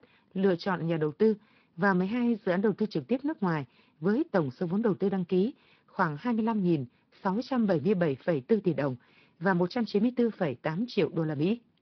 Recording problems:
high frequencies cut off; noticeable; nothing above 5.5 kHz
garbled, watery; slightly

